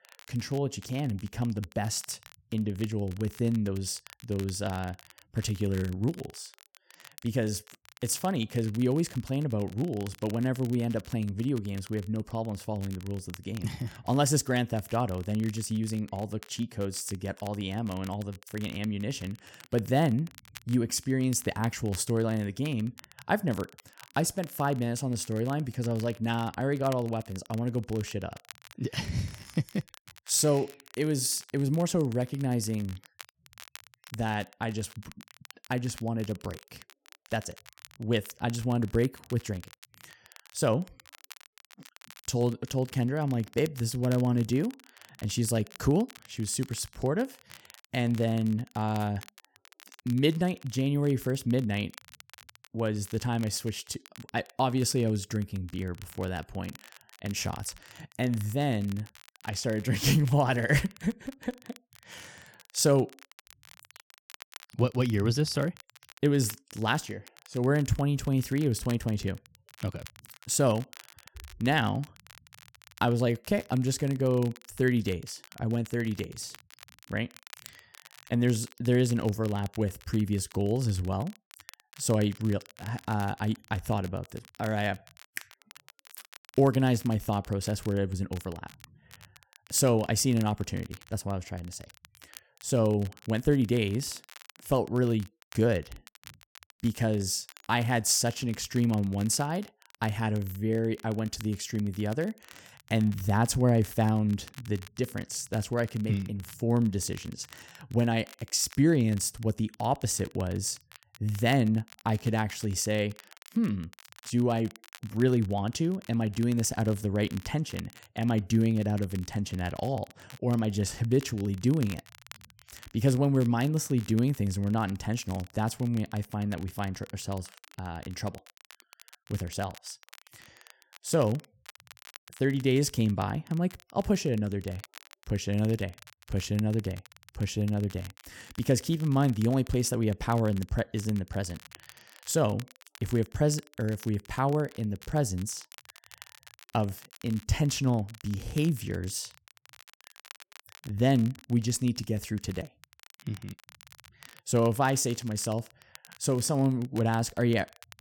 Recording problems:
crackle, like an old record; faint; 20 dB below the speech

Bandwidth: 17.5 kHz